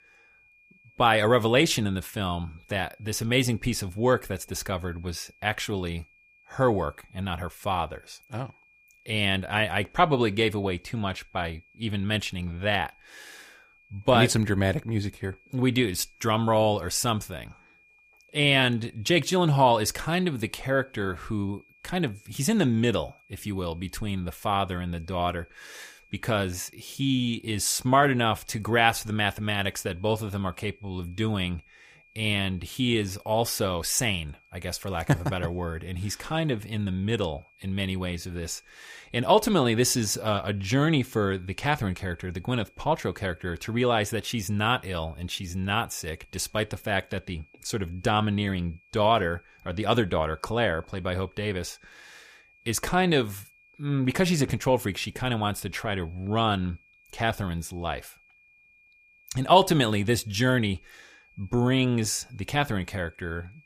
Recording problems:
high-pitched whine; faint; throughout; 2.5 kHz, 30 dB below the speech

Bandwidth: 15 kHz